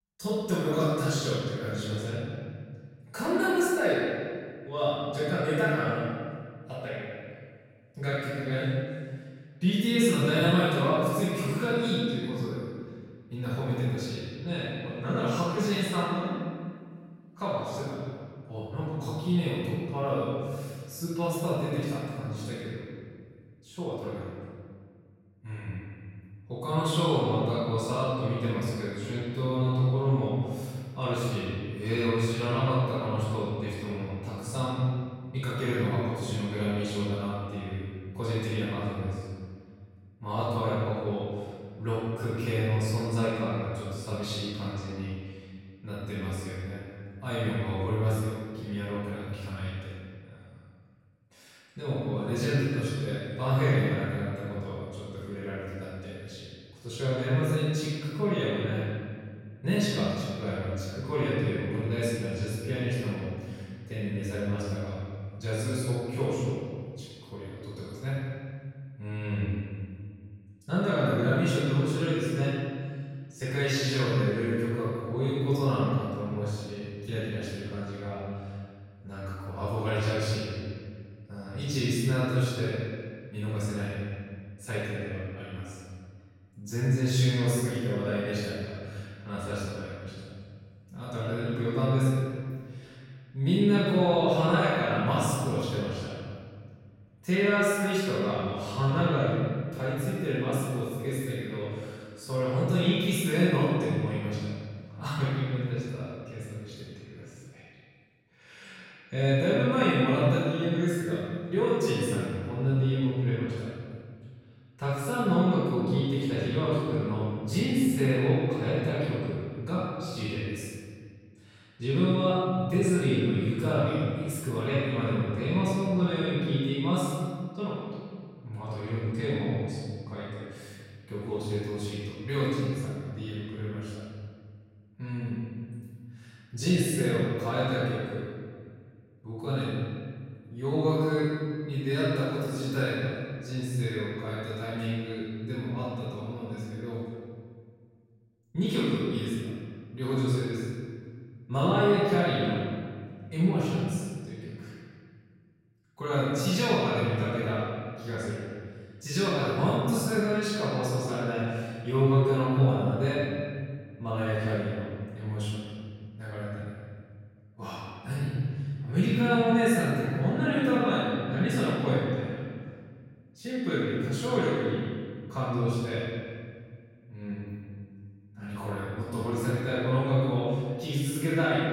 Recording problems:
room echo; strong; dies away in 1.8 s
off-mic speech; far

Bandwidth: 16 kHz